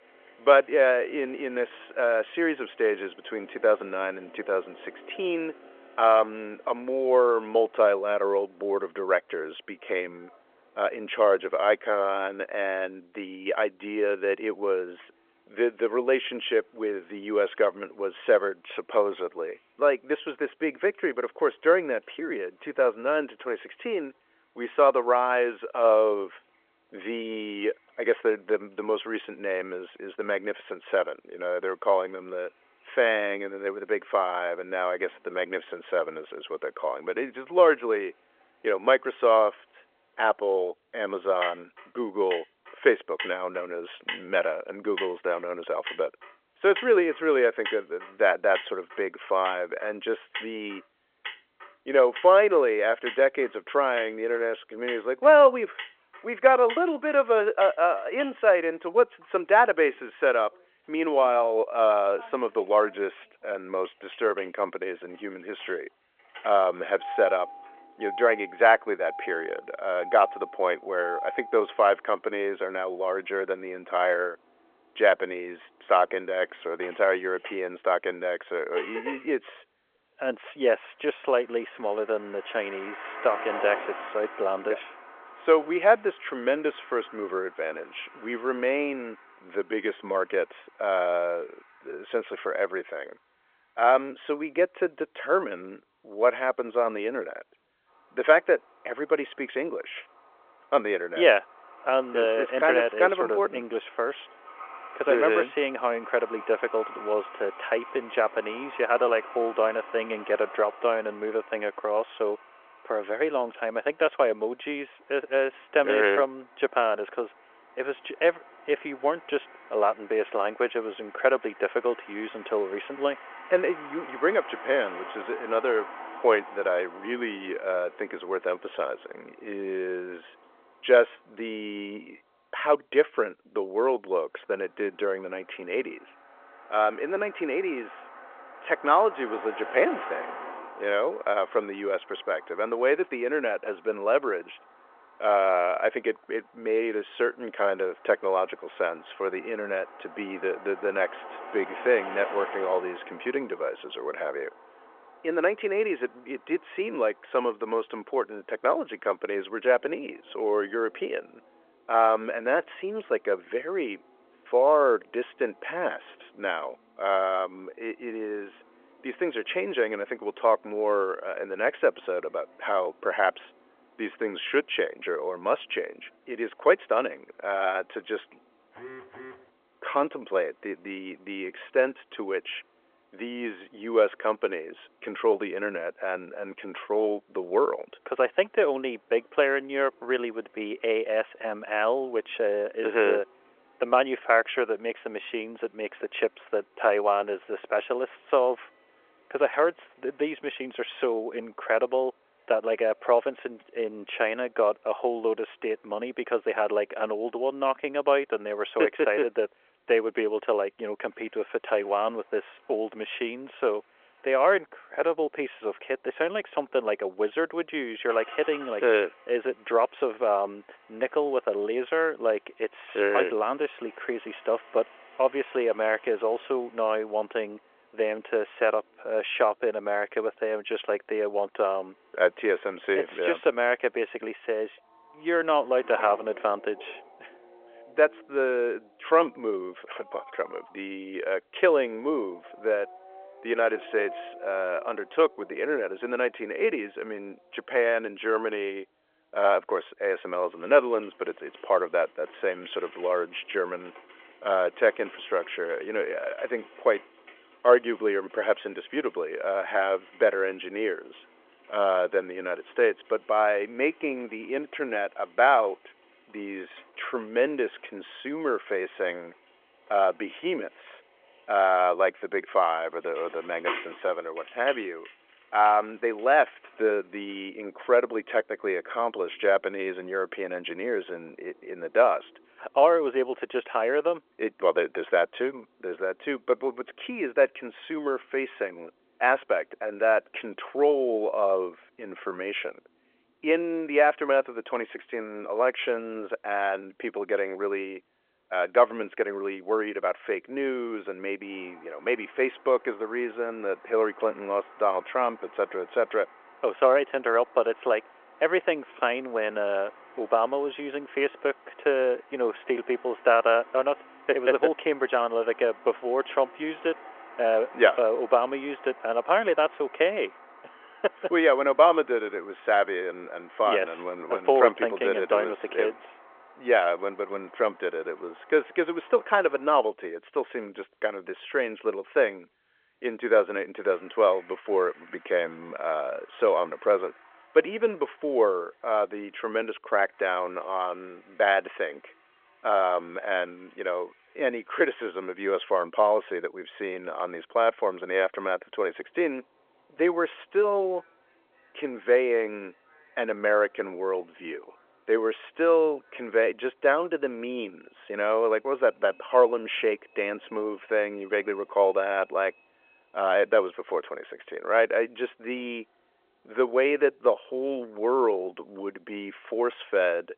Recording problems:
phone-call audio
traffic noise; noticeable; throughout; 20 dB below the speech
phone ringing; faint; at 2:59; peak 15 dB below the speech

